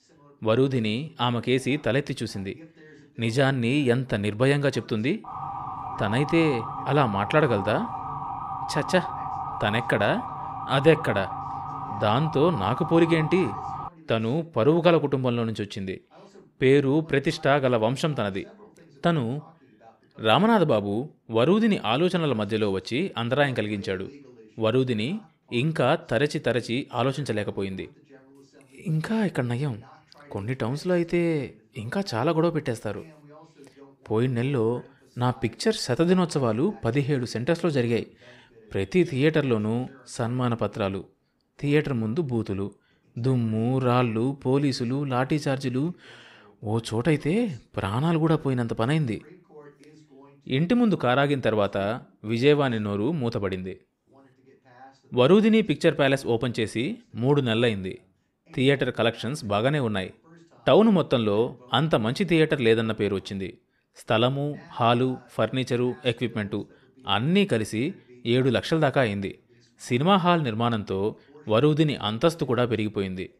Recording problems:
voice in the background; faint; throughout; 30 dB below the speech
siren; noticeable; from 5 to 14 s; peak 7 dB below the speech

